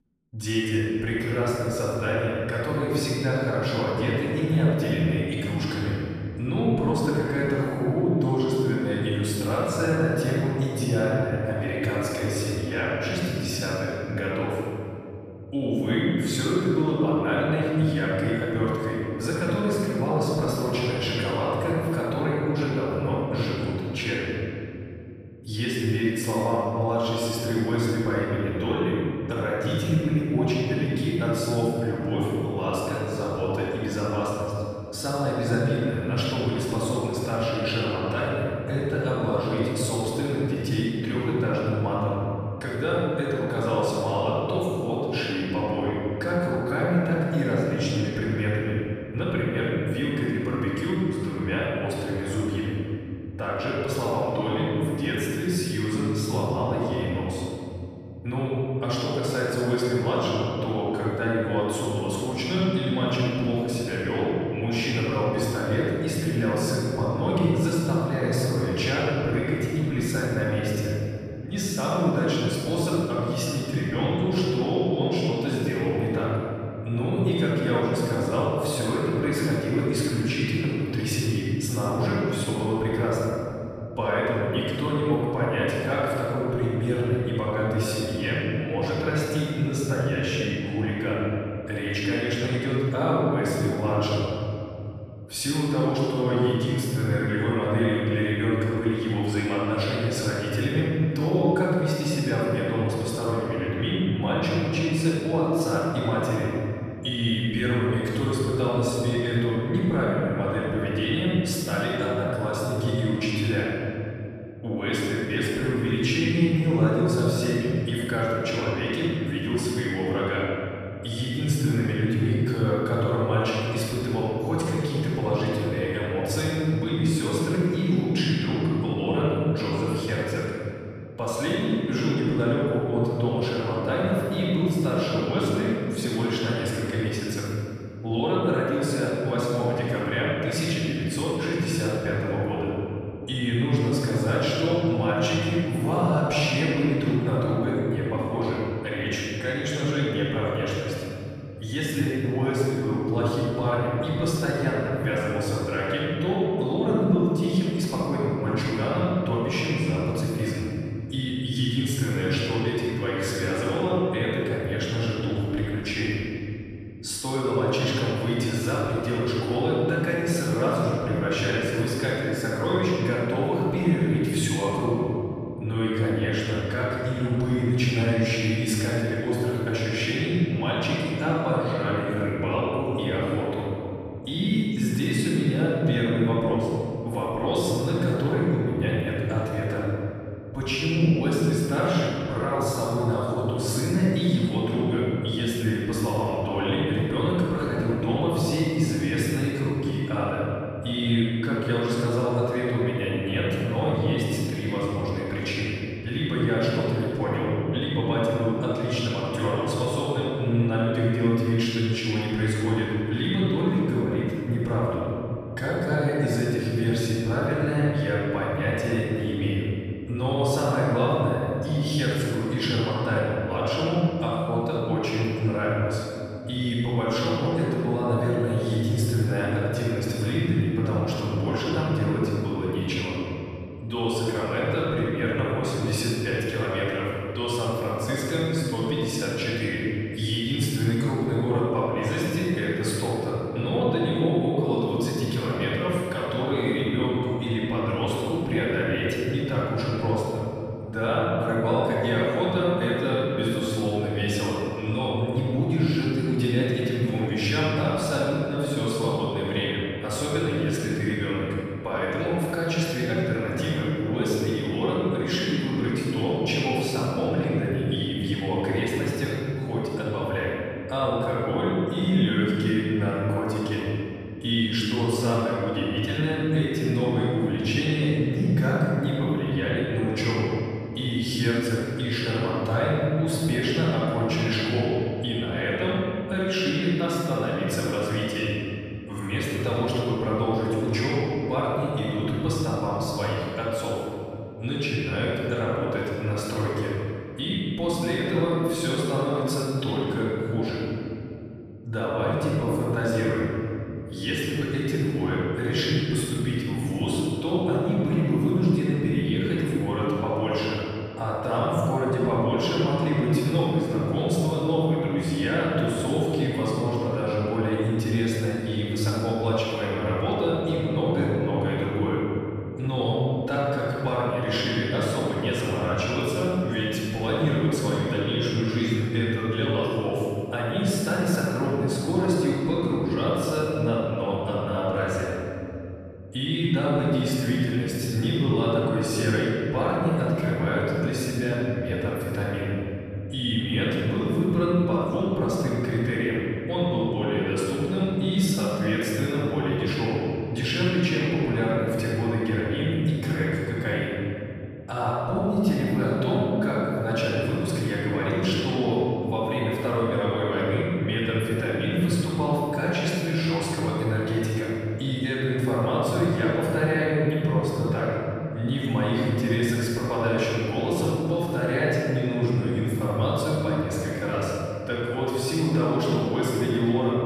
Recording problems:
room echo; strong; dies away in 3 s
off-mic speech; far

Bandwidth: 14.5 kHz